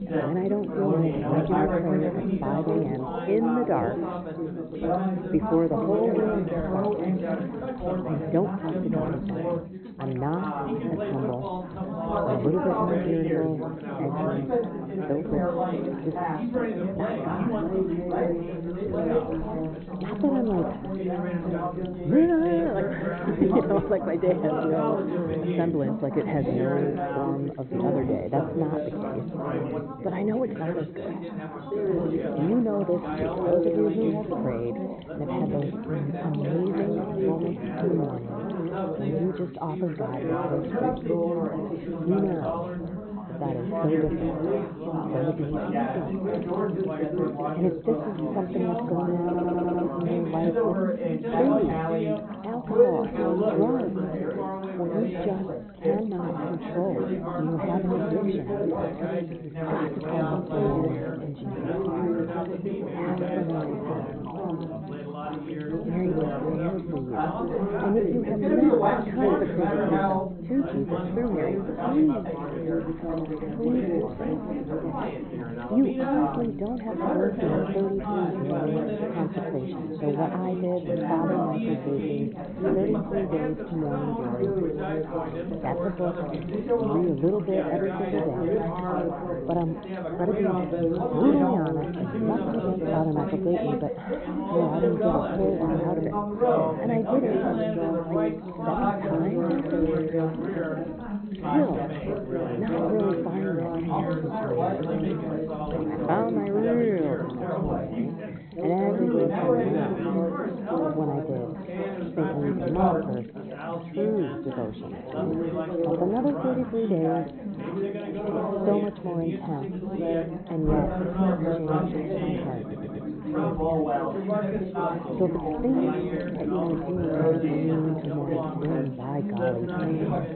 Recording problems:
high frequencies cut off; severe; nothing above 4 kHz
muffled; very slightly; fading above 1.5 kHz
chatter from many people; very loud; throughout; 1 dB above the speech
electrical hum; faint; throughout; 60 Hz, 25 dB below the speech
audio stuttering; at 49 s and at 2:03

